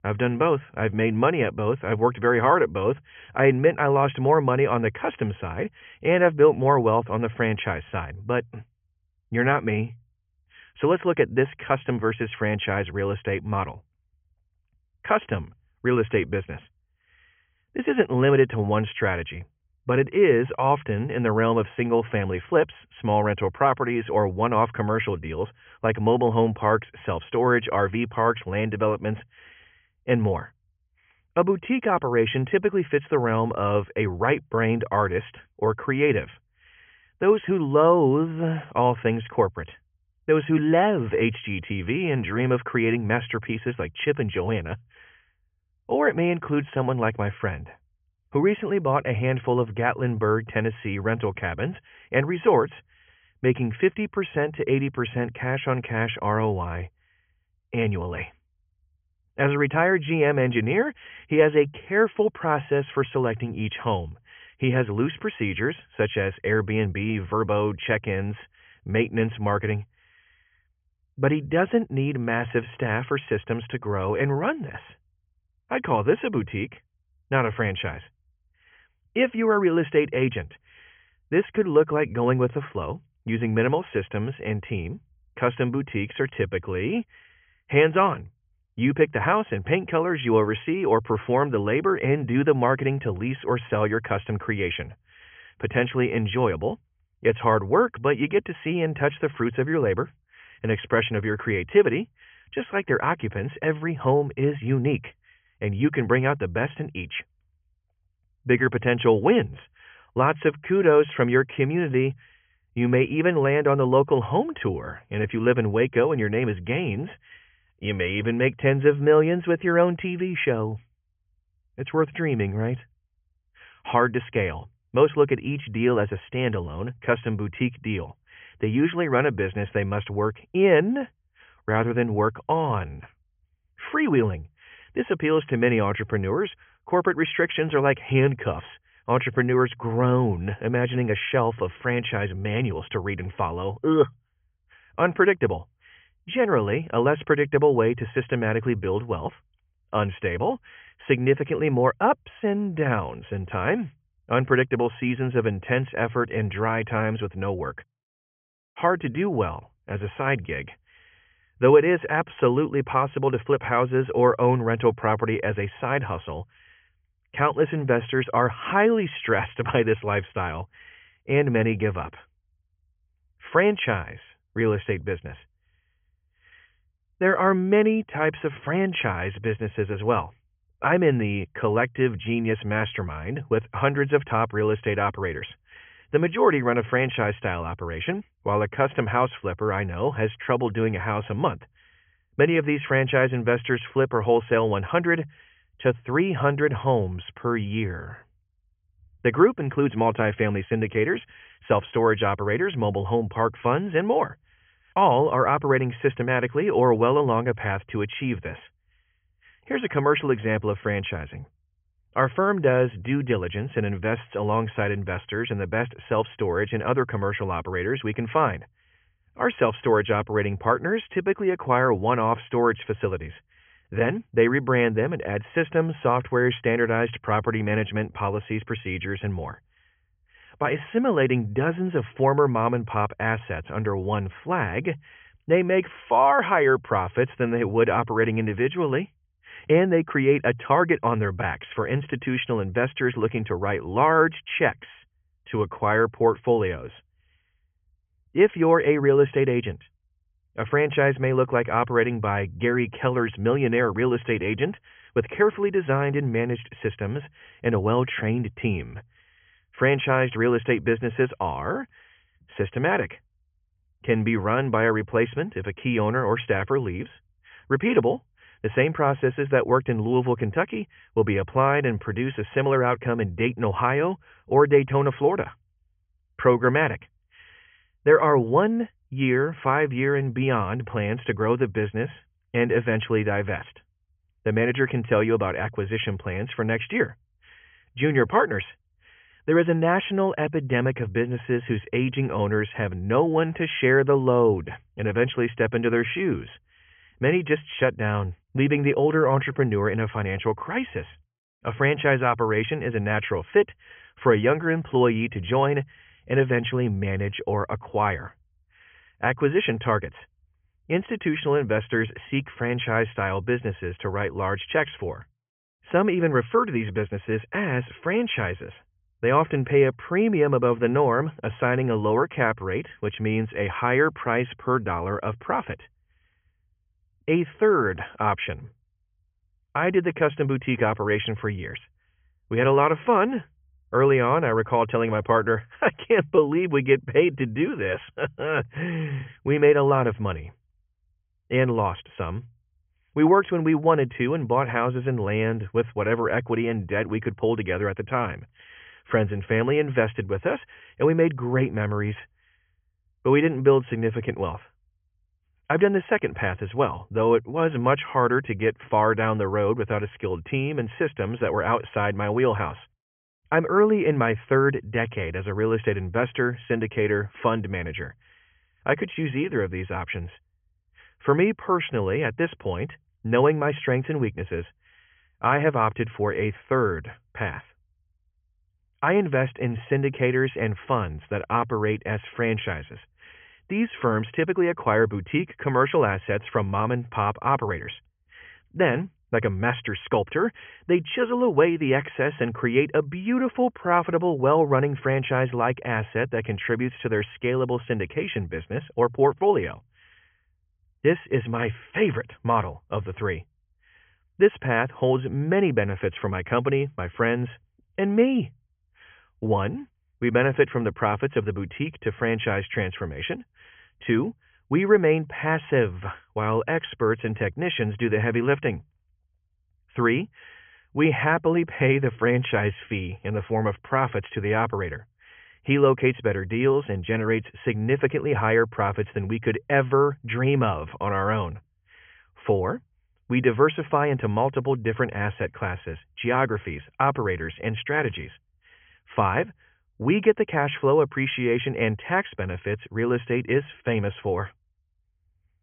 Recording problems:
high frequencies cut off; severe; nothing above 3.5 kHz

